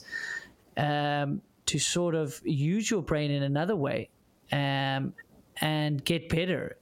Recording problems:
squashed, flat; heavily

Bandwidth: 16.5 kHz